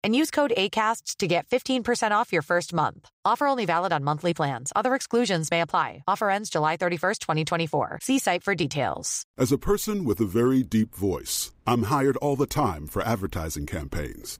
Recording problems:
none

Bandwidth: 15.5 kHz